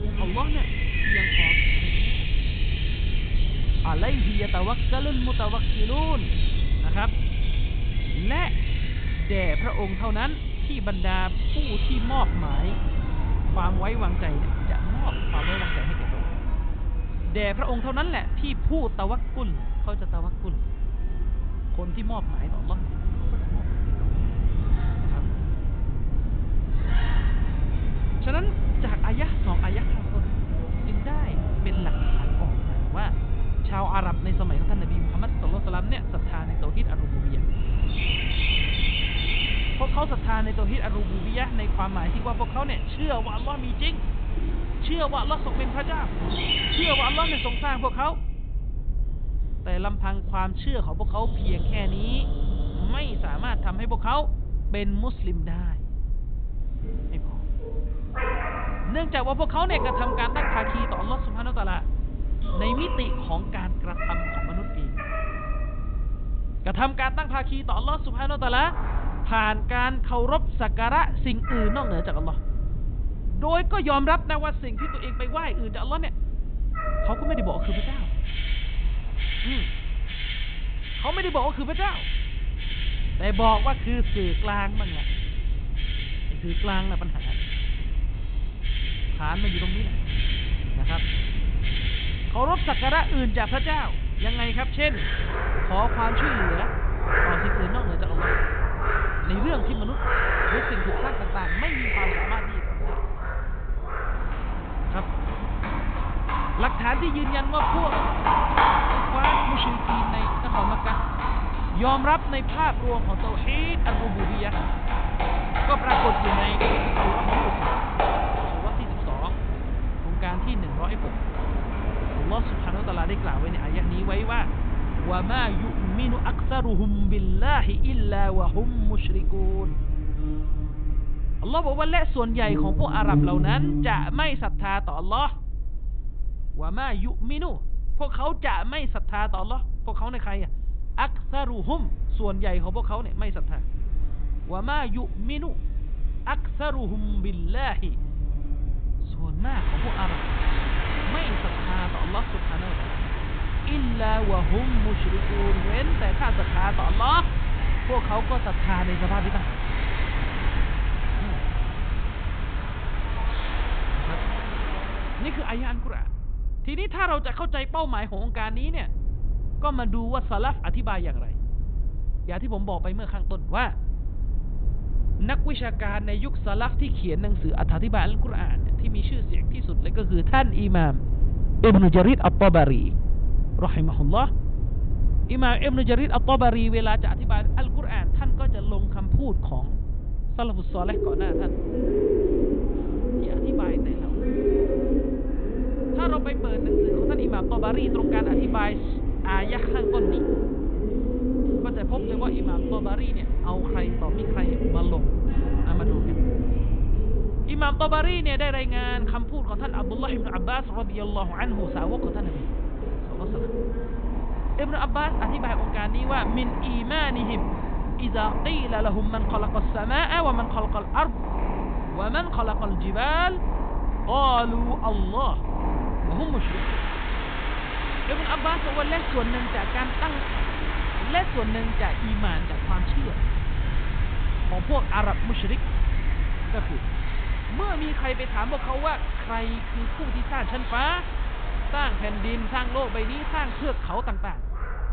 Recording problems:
high frequencies cut off; severe; nothing above 4 kHz
animal sounds; loud; throughout; 2 dB below the speech
low rumble; noticeable; throughout; 20 dB below the speech

